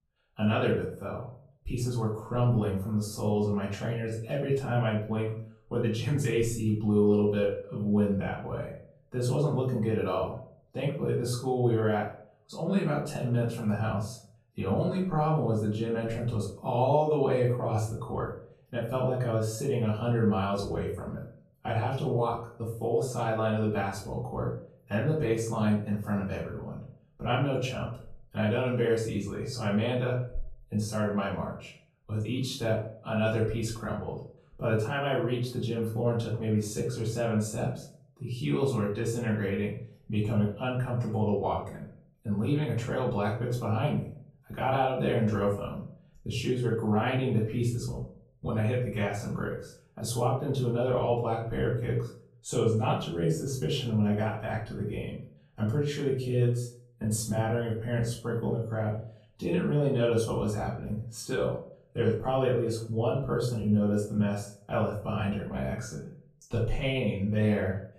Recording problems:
off-mic speech; far
room echo; noticeable; dies away in 0.4 s

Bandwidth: 14 kHz